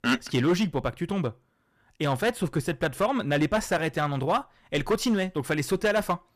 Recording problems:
distortion; slight; 5% of the sound clipped

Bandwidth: 14.5 kHz